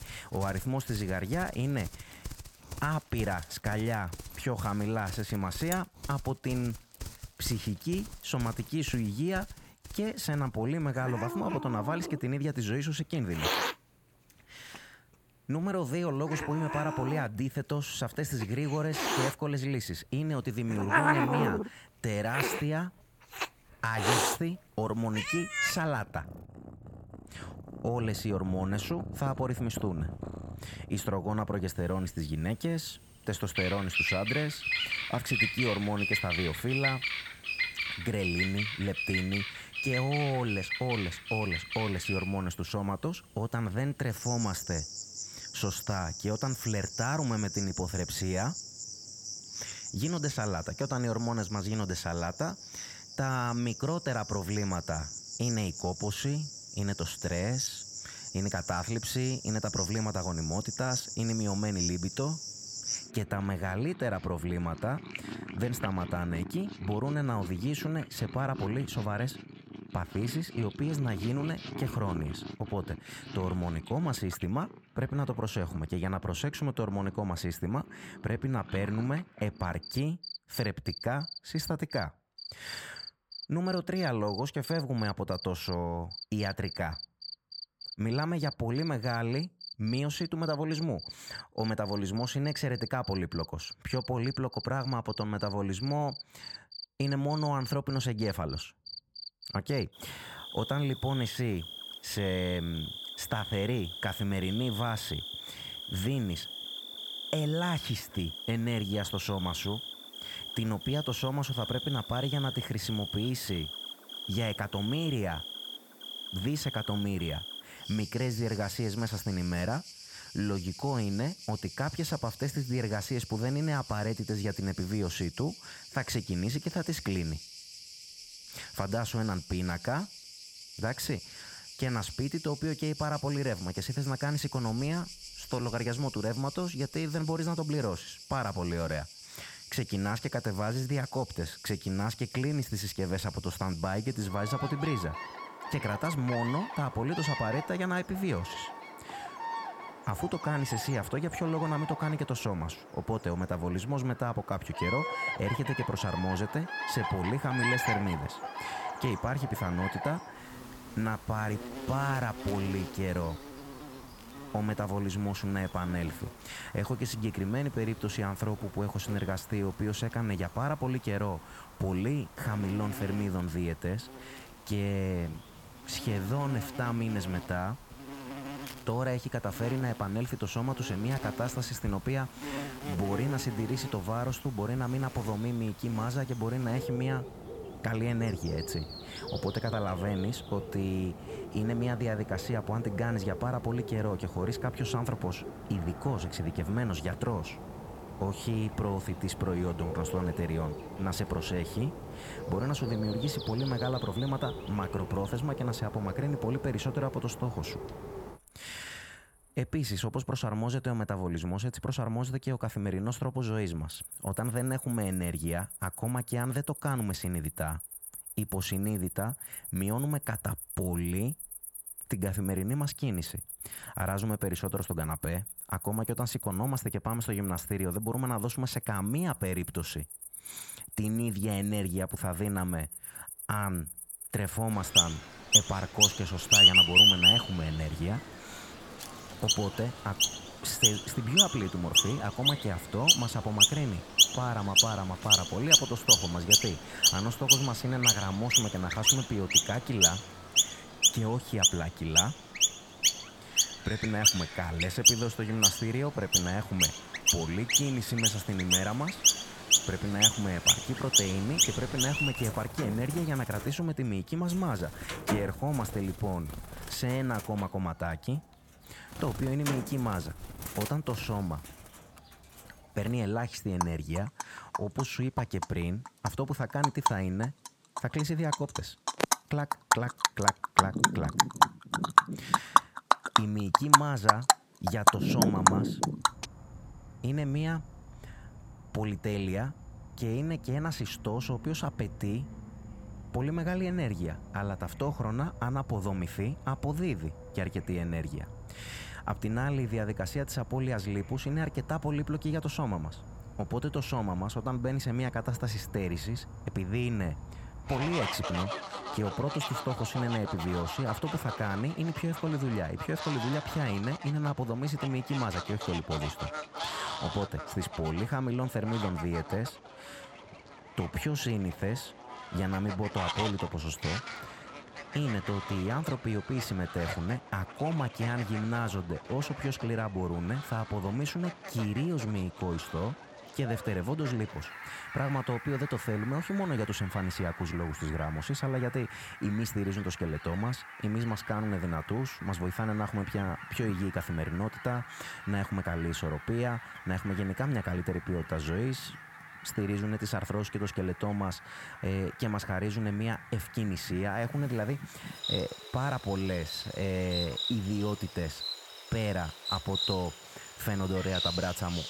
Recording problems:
animal sounds; very loud; throughout; 1 dB above the speech

